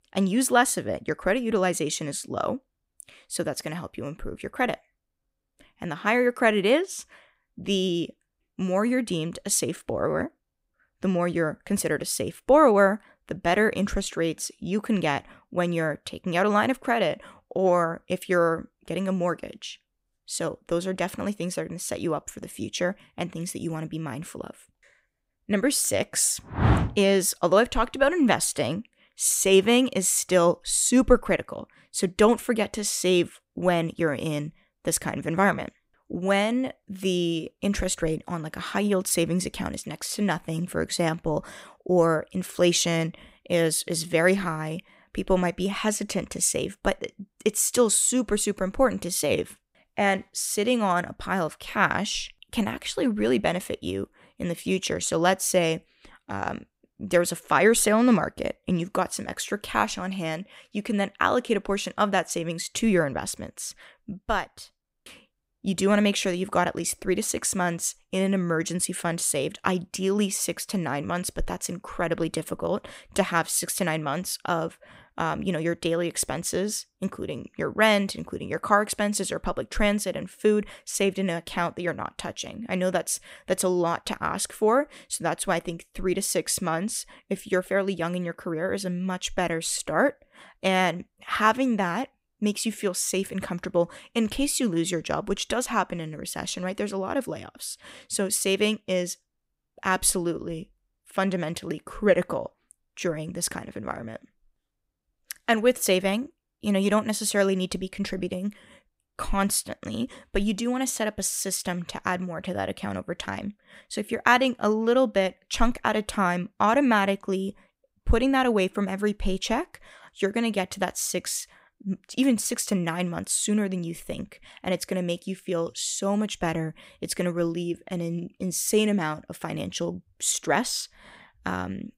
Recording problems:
none

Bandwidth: 15.5 kHz